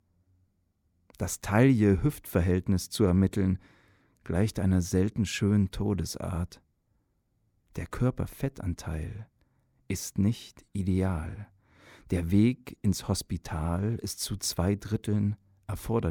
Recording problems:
abrupt cut into speech; at the end

